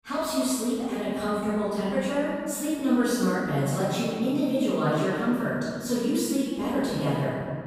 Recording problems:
room echo; strong; dies away in 2.1 s
off-mic speech; far

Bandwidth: 15.5 kHz